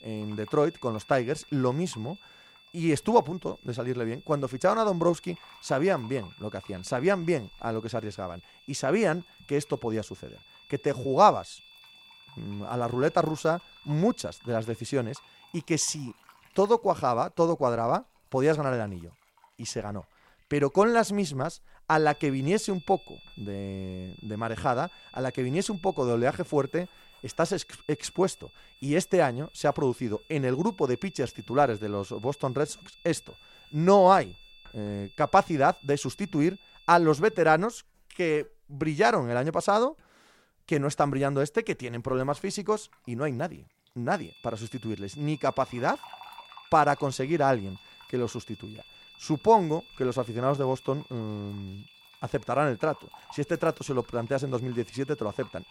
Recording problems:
high-pitched whine; faint; until 16 s, from 22 to 37 s and from 44 s on; 3.5 kHz, 25 dB below the speech
household noises; faint; throughout; 30 dB below the speech

